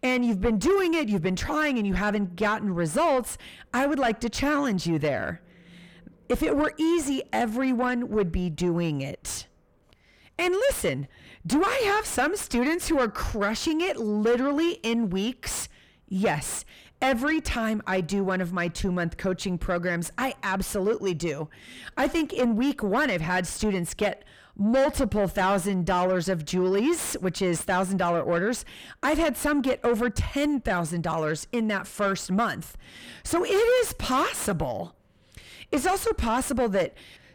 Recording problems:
distortion; heavy; 6 dB below the speech

